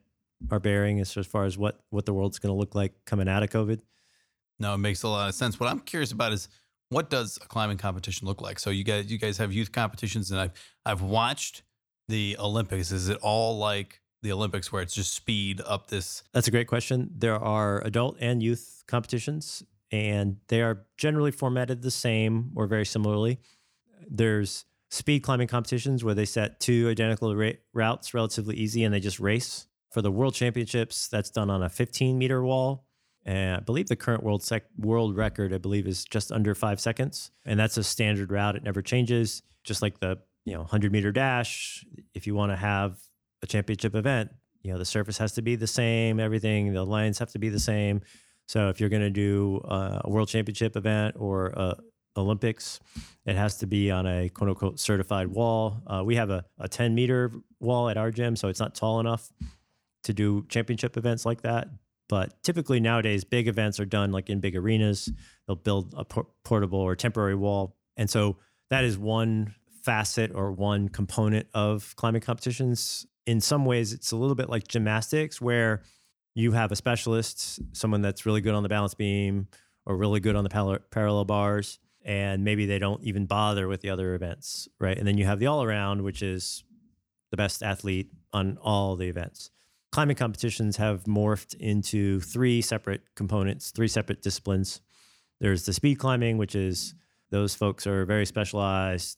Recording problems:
uneven, jittery; strongly; from 53 s to 1:28

